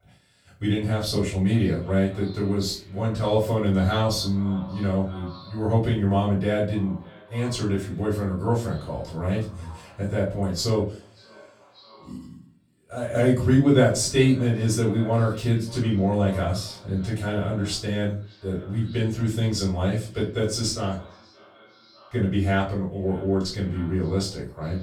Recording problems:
off-mic speech; far
echo of what is said; faint; throughout; 580 ms later, 25 dB below the speech
room echo; slight; dies away in 0.3 s

